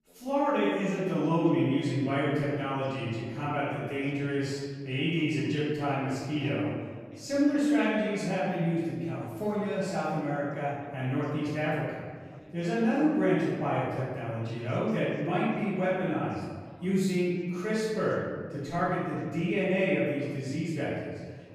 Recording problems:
room echo; strong; dies away in 1.5 s
off-mic speech; far
echo of what is said; faint; throughout; 200 ms later, 20 dB below the speech
background chatter; faint; throughout; 2 voices, 25 dB below the speech

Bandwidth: 14.5 kHz